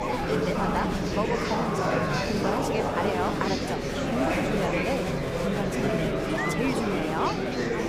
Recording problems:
murmuring crowd; very loud; throughout; 5 dB above the speech

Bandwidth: 15.5 kHz